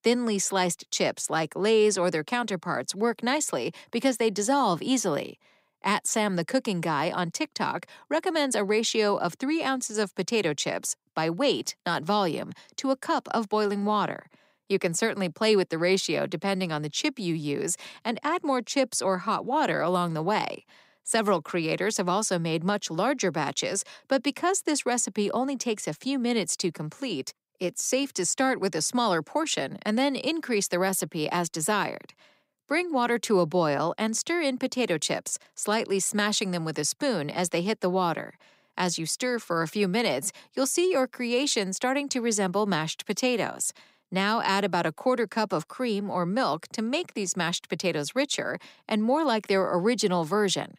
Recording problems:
none

